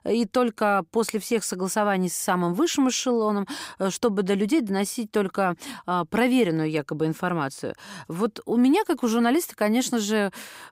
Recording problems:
none

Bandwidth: 15.5 kHz